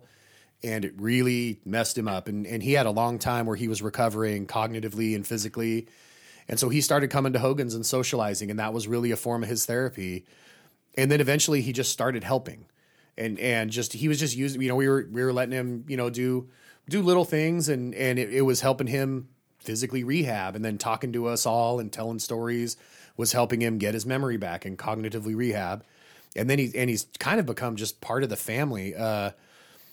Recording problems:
none

